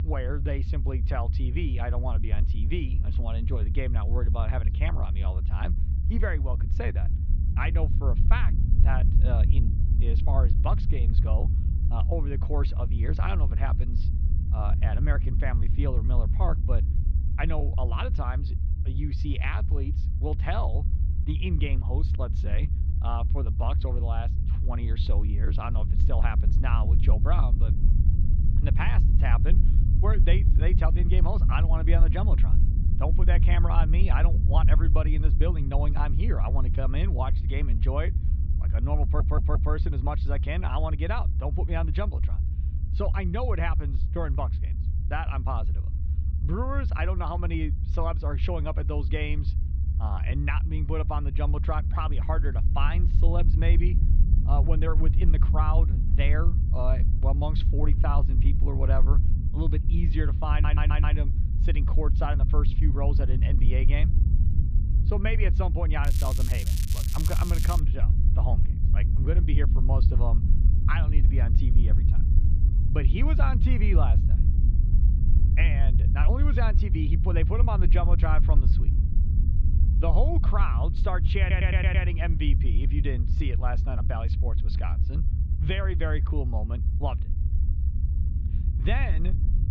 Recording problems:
muffled; slightly; fading above 3.5 kHz
low rumble; loud; throughout; 8 dB below the speech
crackling; loud; from 1:06 to 1:08; 4 dB below the speech
audio stuttering; at 39 s, at 1:01 and at 1:21

